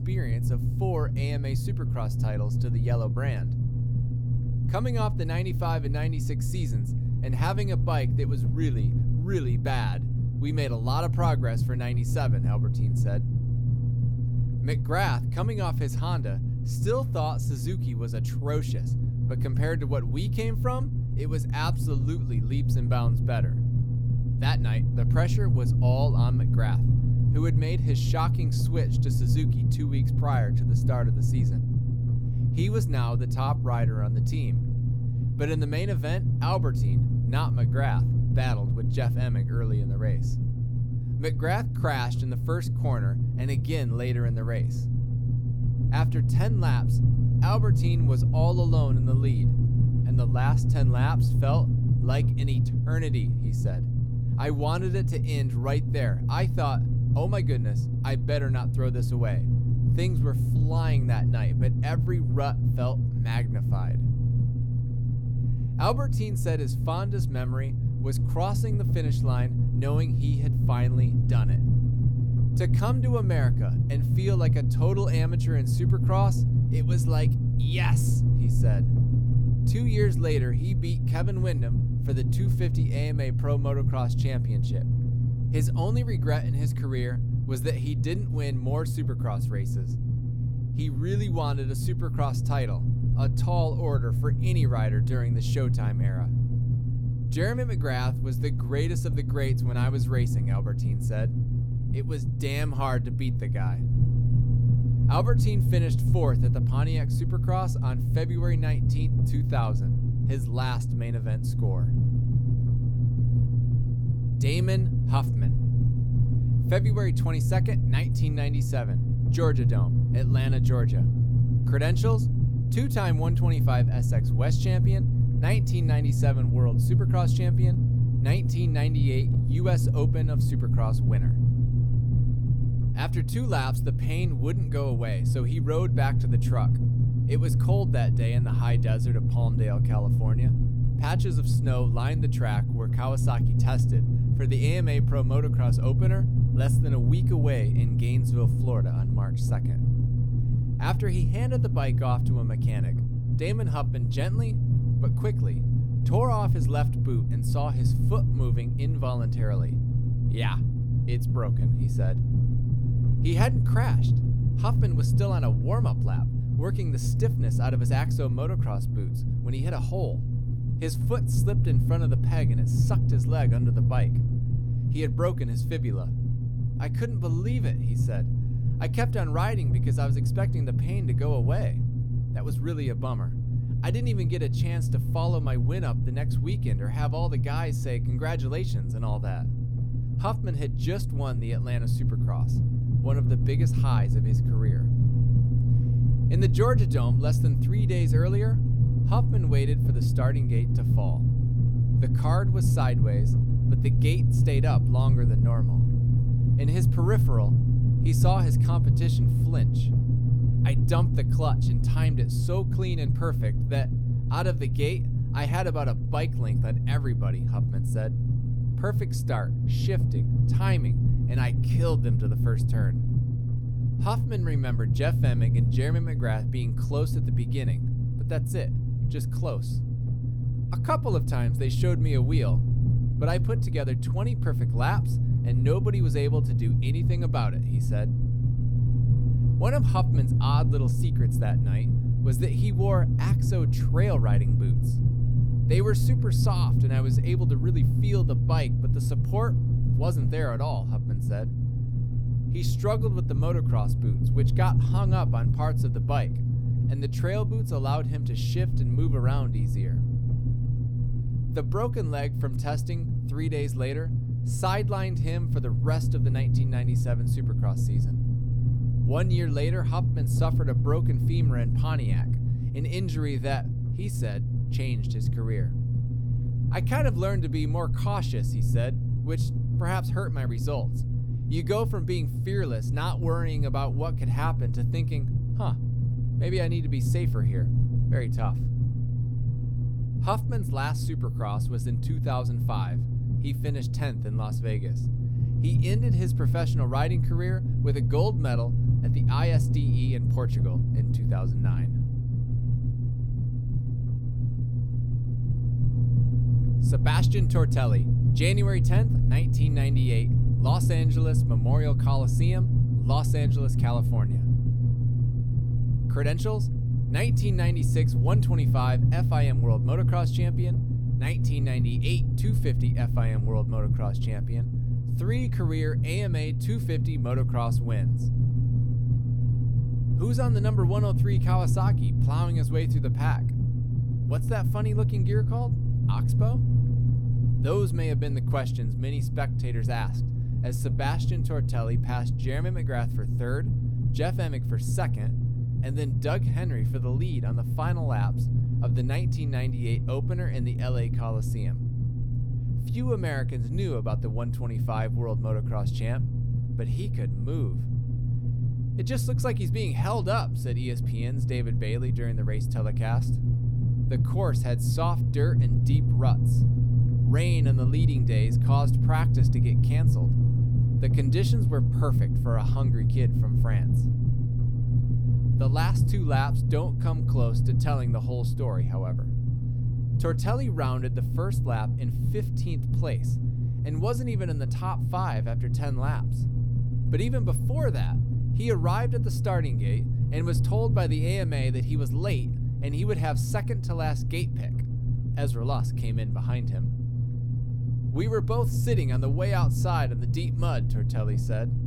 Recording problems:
low rumble; loud; throughout; 3 dB below the speech

